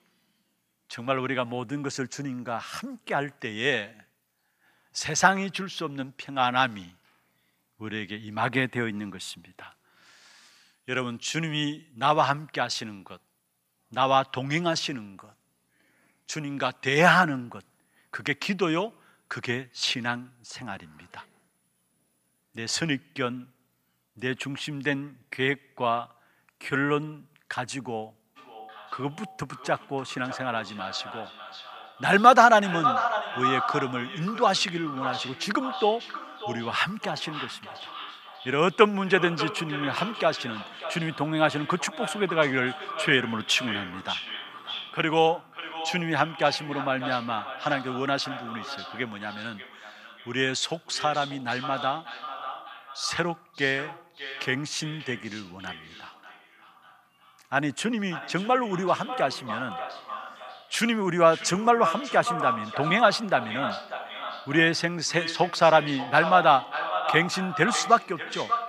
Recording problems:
echo of what is said; strong; from 28 s on; 590 ms later, 8 dB below the speech

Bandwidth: 14.5 kHz